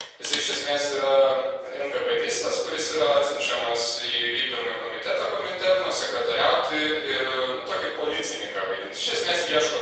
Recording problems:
room echo; strong; dies away in 1 s
off-mic speech; far
thin; very; fading below 500 Hz
garbled, watery; slightly; nothing above 8 kHz
phone ringing; noticeable; at the start; peak 5 dB below the speech

